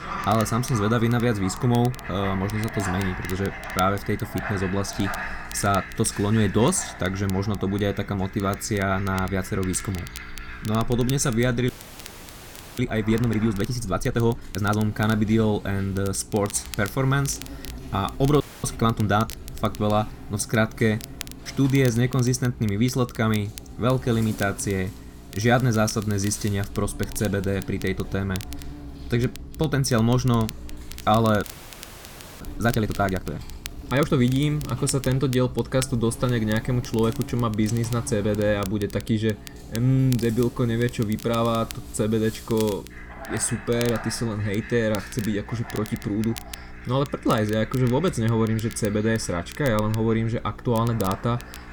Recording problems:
animal sounds; noticeable; throughout; 15 dB below the speech
crackle, like an old record; noticeable; 20 dB below the speech
electrical hum; faint; throughout; 60 Hz, 25 dB below the speech
audio freezing; at 12 s for 1 s, at 18 s and at 31 s for 1 s

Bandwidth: 18.5 kHz